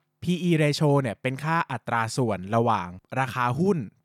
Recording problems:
none

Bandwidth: 18.5 kHz